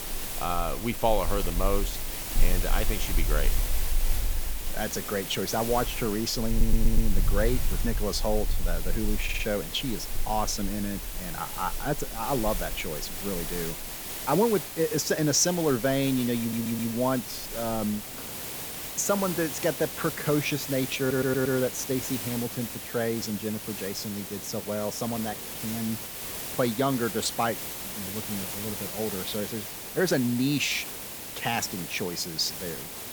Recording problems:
animal sounds; loud; throughout; 6 dB below the speech
hiss; loud; throughout; 5 dB below the speech
audio stuttering; 4 times, first at 6.5 s

